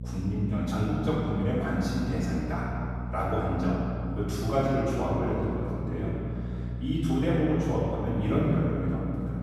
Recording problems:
room echo; strong; dies away in 2.6 s
off-mic speech; far
electrical hum; noticeable; throughout; 60 Hz, 15 dB below the speech

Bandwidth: 14.5 kHz